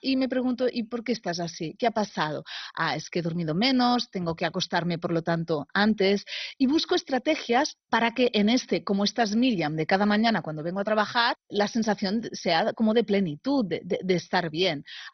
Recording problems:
garbled, watery; badly; nothing above 6 kHz

